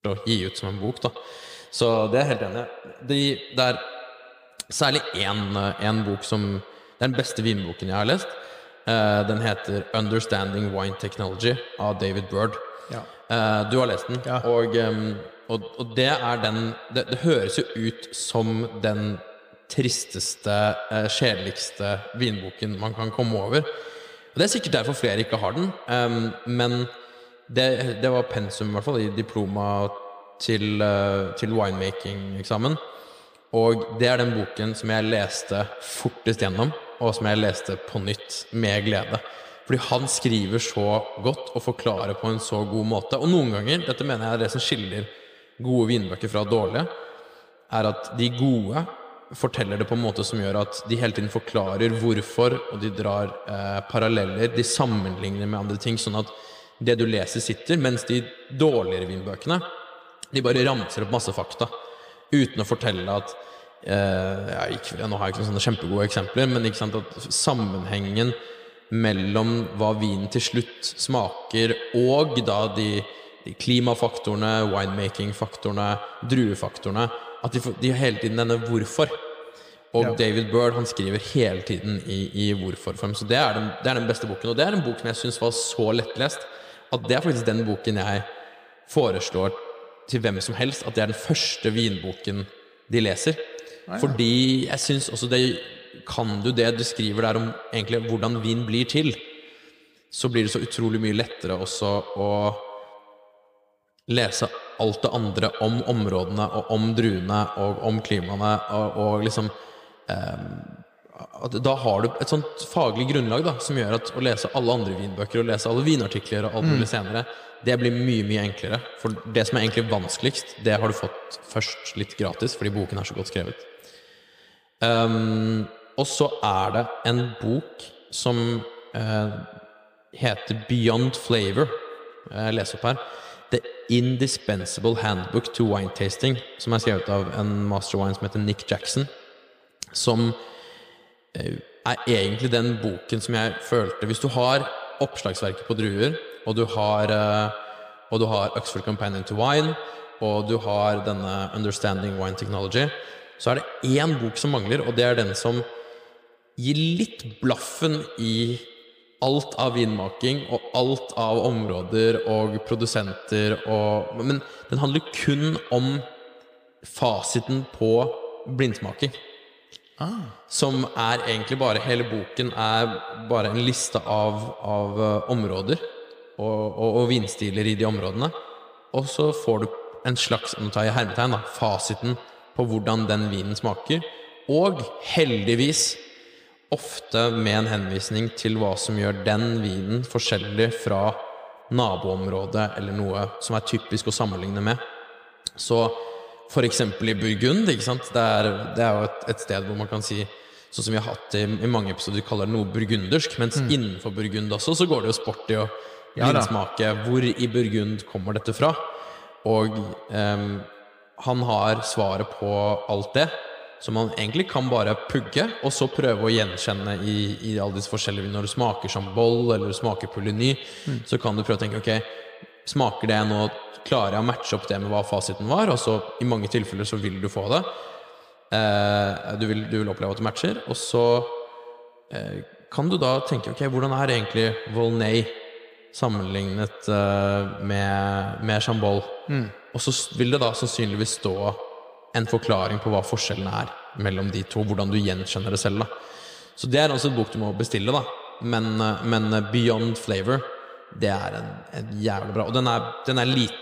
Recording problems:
echo of what is said; noticeable; throughout; 110 ms later, 10 dB below the speech

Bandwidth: 15 kHz